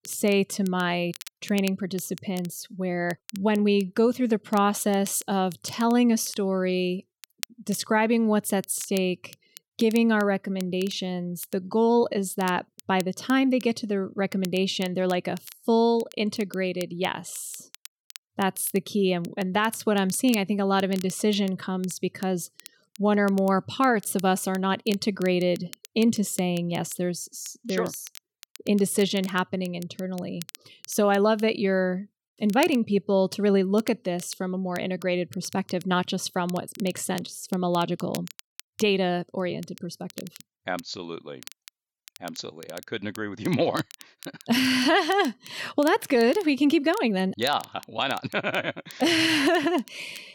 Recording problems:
crackle, like an old record; faint; 20 dB below the speech

